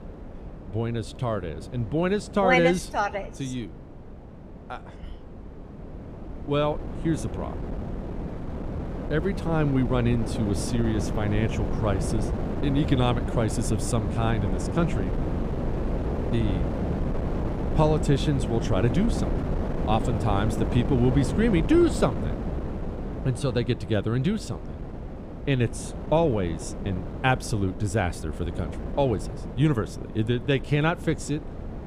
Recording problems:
wind noise on the microphone; heavy; 8 dB below the speech

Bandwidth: 15 kHz